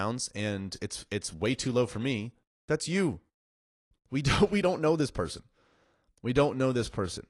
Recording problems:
garbled, watery; slightly
abrupt cut into speech; at the start

